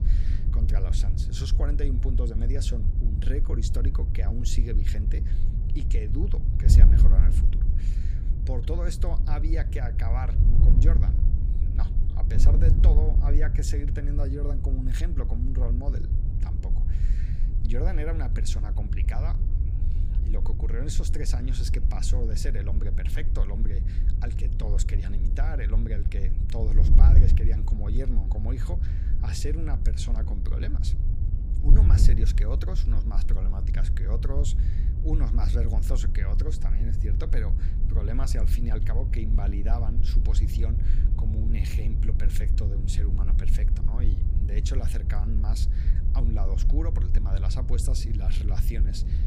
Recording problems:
wind noise on the microphone; heavy; 4 dB below the speech

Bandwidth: 15.5 kHz